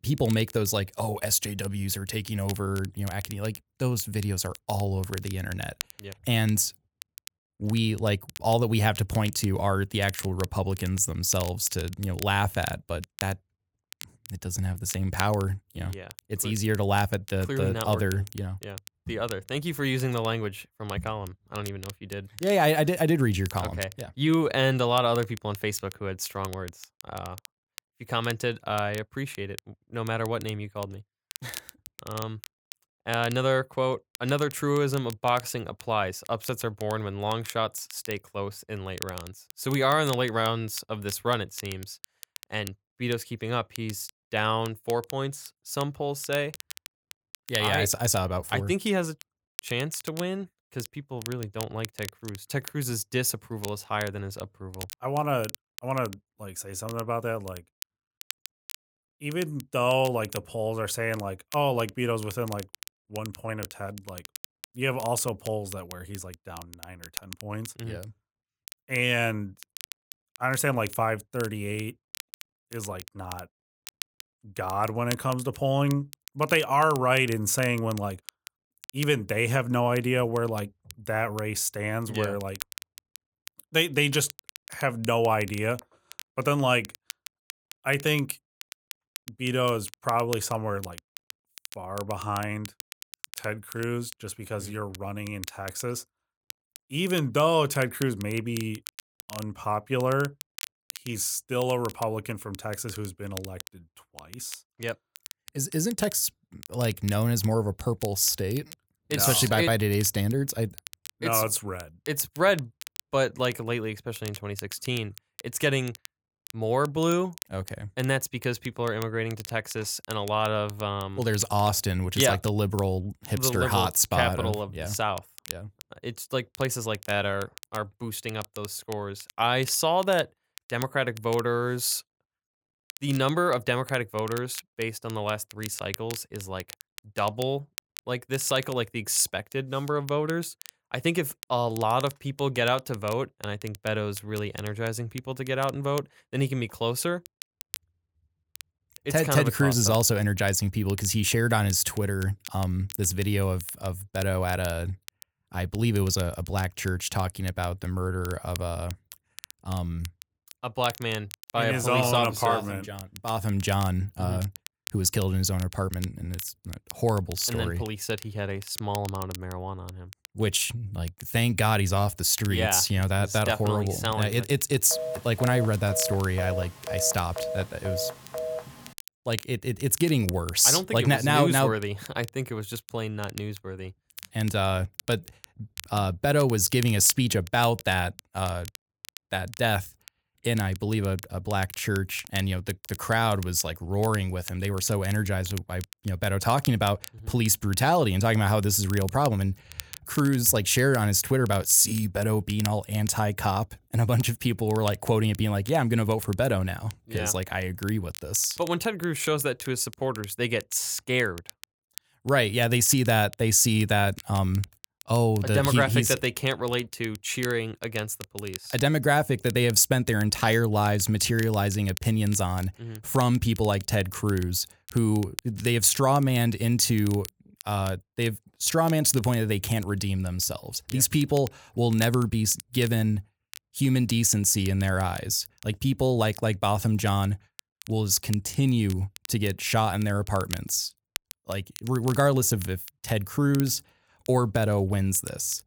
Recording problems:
crackle, like an old record; noticeable; 15 dB below the speech
phone ringing; noticeable; from 2:55 to 2:59; peak 7 dB below the speech

